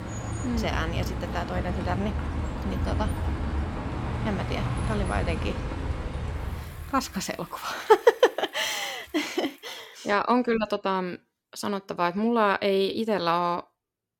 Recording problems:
traffic noise; loud; until 10 s; 4 dB below the speech

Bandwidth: 17 kHz